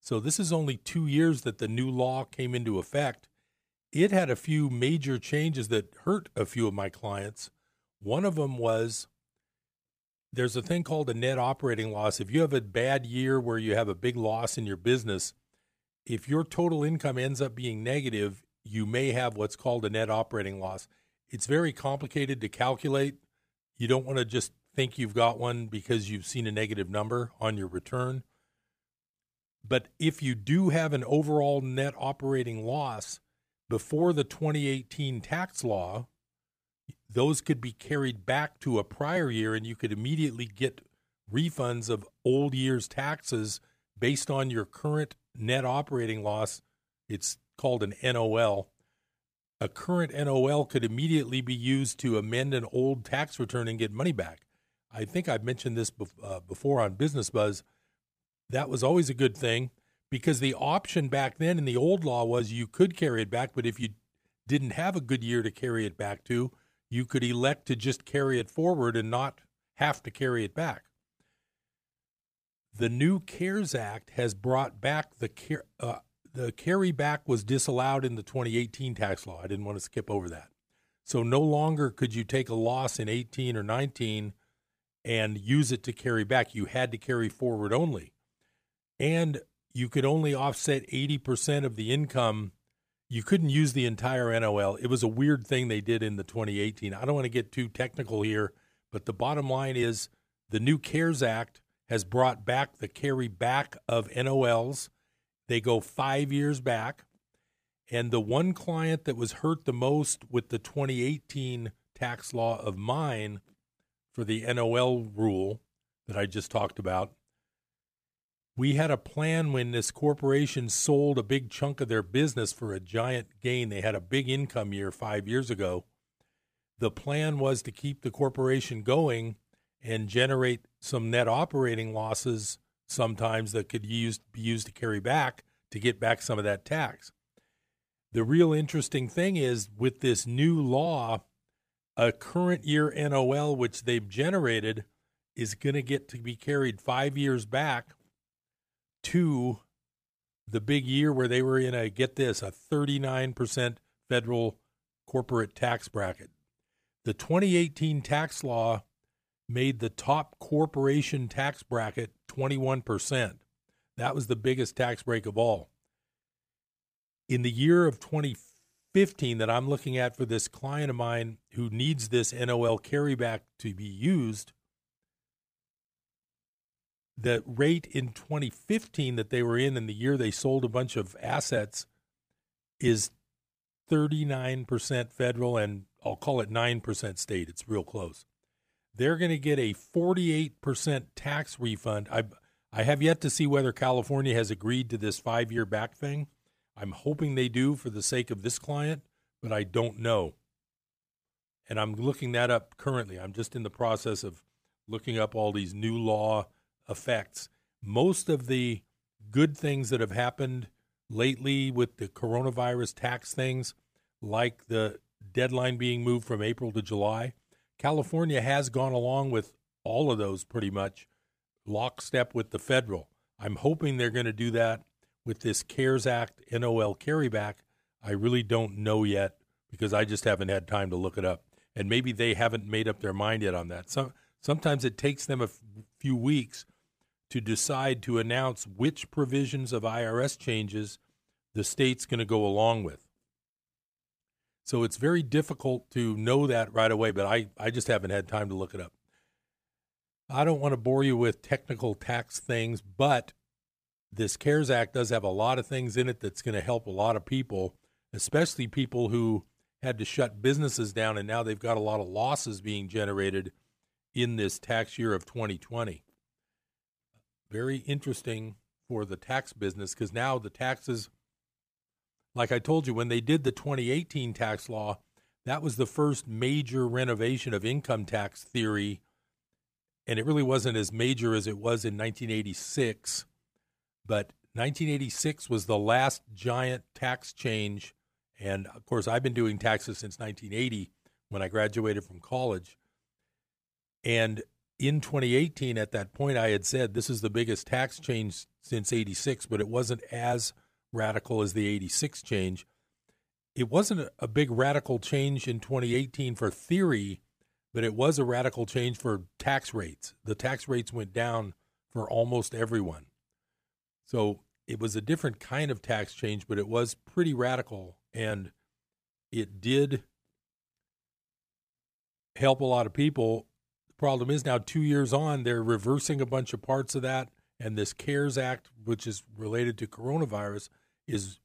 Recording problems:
none

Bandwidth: 15 kHz